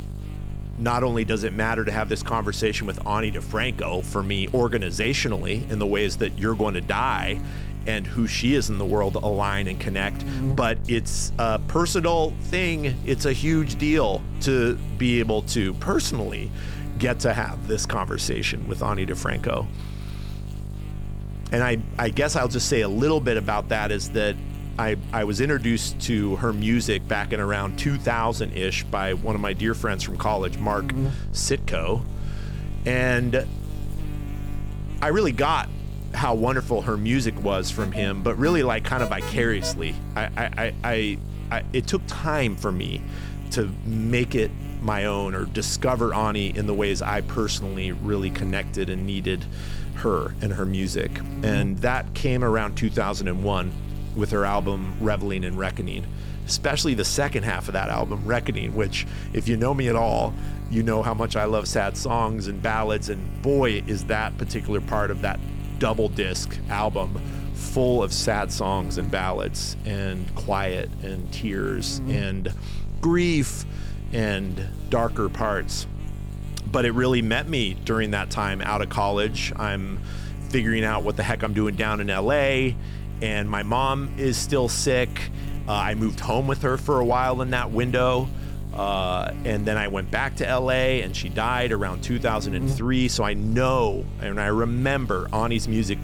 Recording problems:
electrical hum; noticeable; throughout; 50 Hz, 15 dB below the speech
alarm; noticeable; from 38 to 40 s; peak 8 dB below the speech

